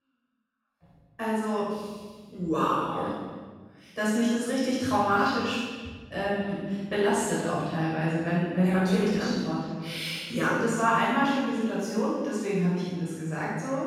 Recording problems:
room echo; strong; dies away in 1.4 s
off-mic speech; far
echo of what is said; noticeable; throughout; 280 ms later, 20 dB below the speech

